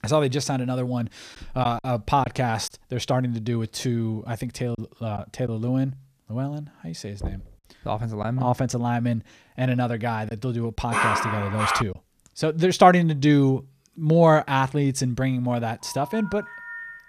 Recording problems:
choppy; occasionally; from 1.5 to 2.5 s, at 5 s and from 8 to 12 s; 3% of the speech affected
door banging; faint; at 7 s; peak 10 dB below the speech
dog barking; loud; at 11 s; peak 2 dB above the speech
phone ringing; faint; from 16 s on; peak 10 dB below the speech

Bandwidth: 14.5 kHz